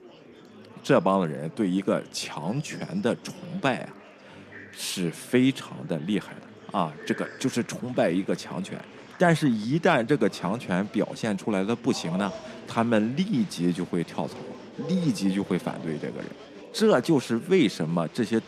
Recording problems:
murmuring crowd; noticeable; throughout; 20 dB below the speech

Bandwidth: 14.5 kHz